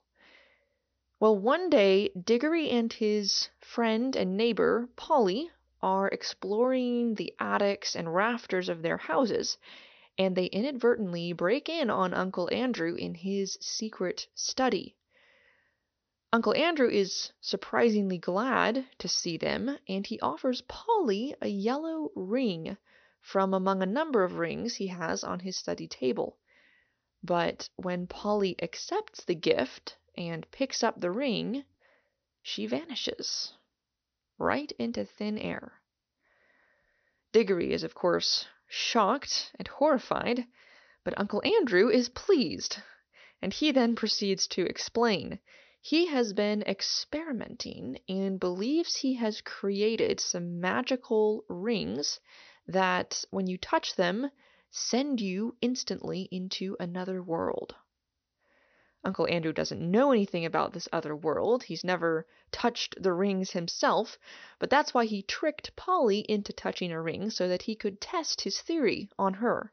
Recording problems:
high frequencies cut off; noticeable; nothing above 6 kHz

